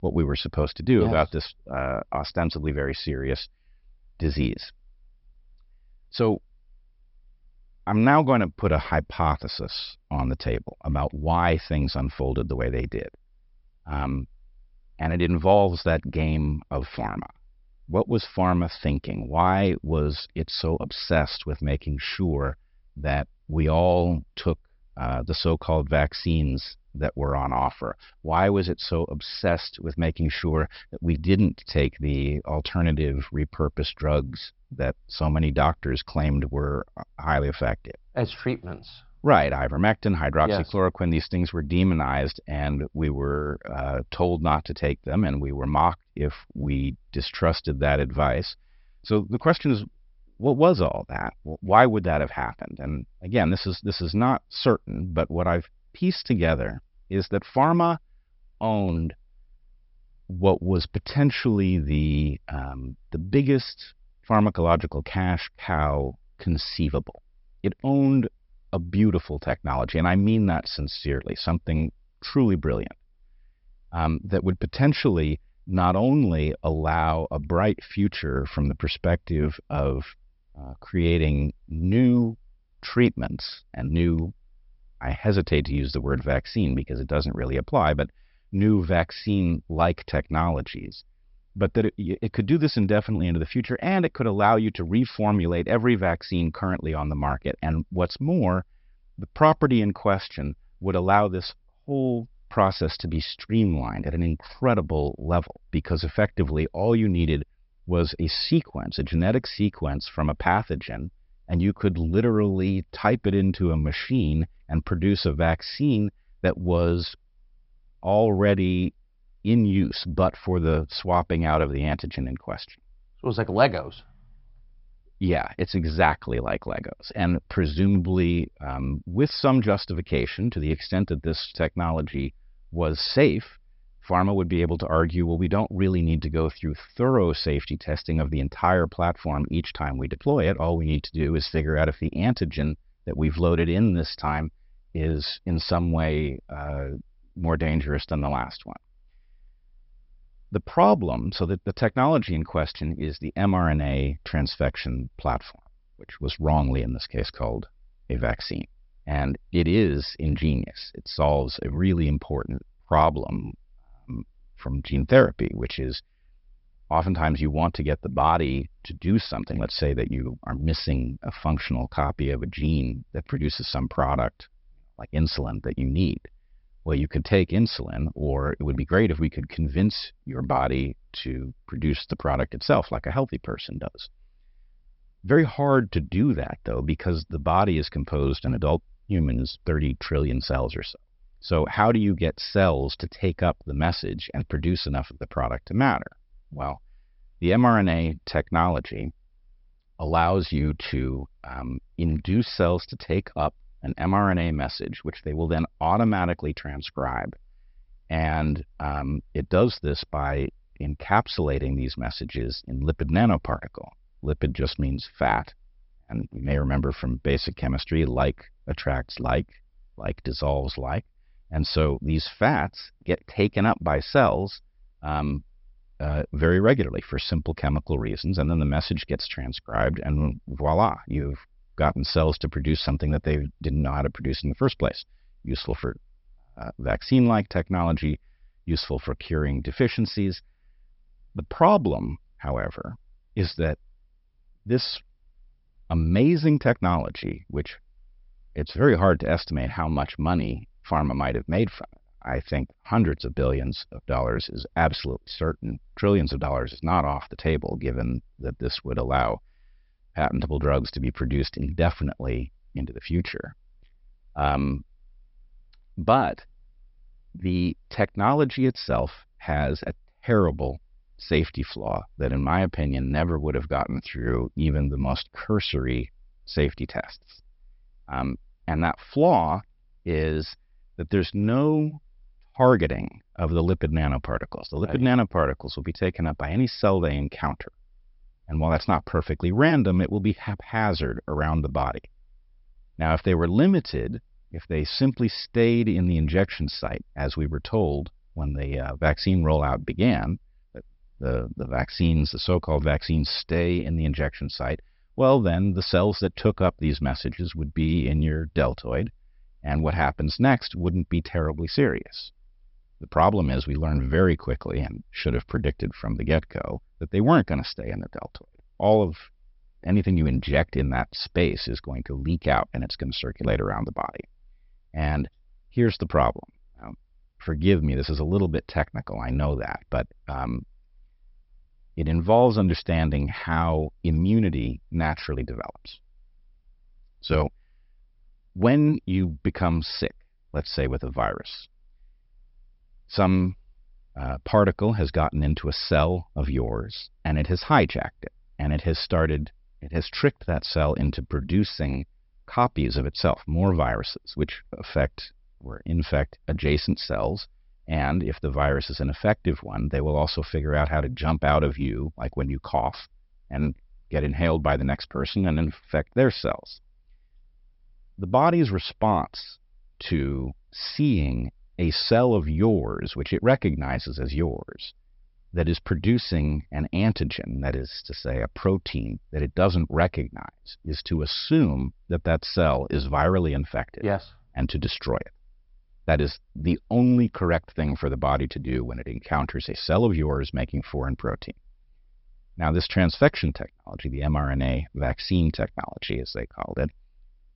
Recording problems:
high frequencies cut off; noticeable; nothing above 5.5 kHz

